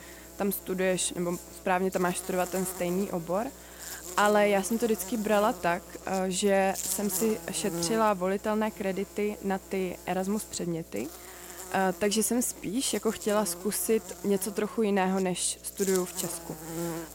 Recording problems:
electrical hum; noticeable; throughout; 60 Hz, 15 dB below the speech

